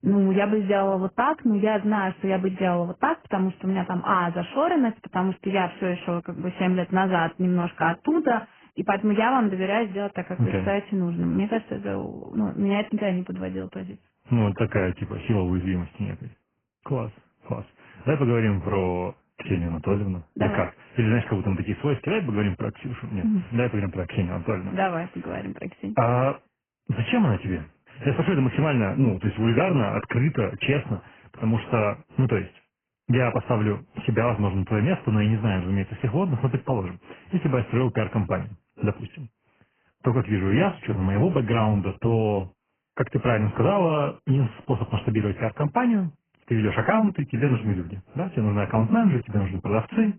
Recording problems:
garbled, watery; badly
high frequencies cut off; severe; nothing above 3 kHz

